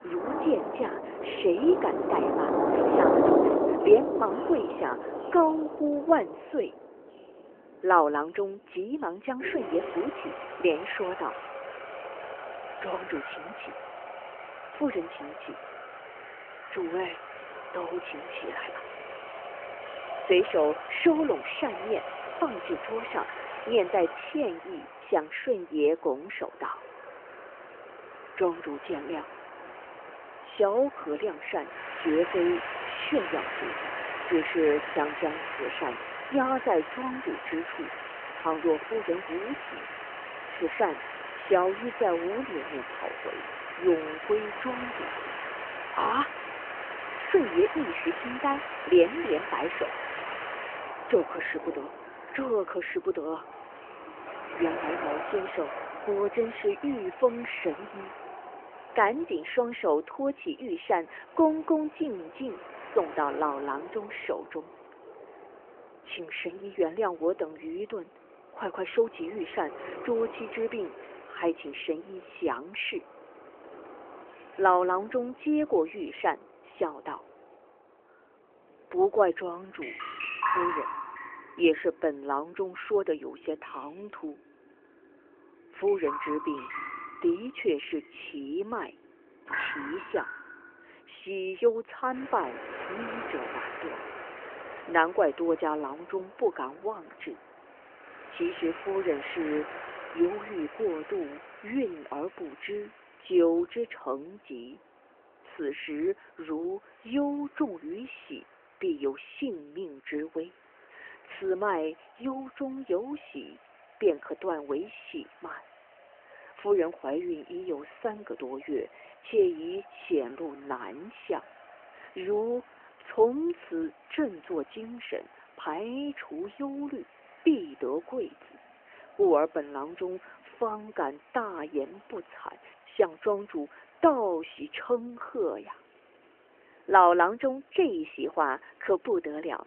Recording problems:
phone-call audio; nothing above 3 kHz
rain or running water; loud; throughout; 5 dB below the speech

